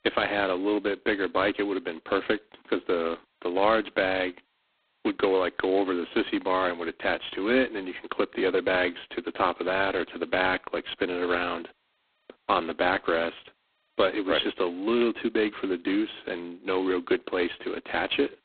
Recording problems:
phone-call audio; poor line; nothing above 4 kHz

